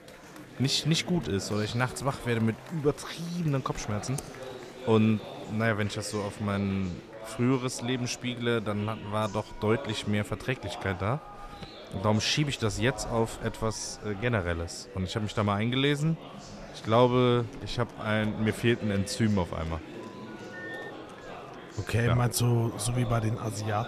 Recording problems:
murmuring crowd; noticeable; throughout; 15 dB below the speech
keyboard typing; faint; at 4 s; peak 15 dB below the speech
phone ringing; faint; at 20 s; peak 10 dB below the speech

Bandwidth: 14.5 kHz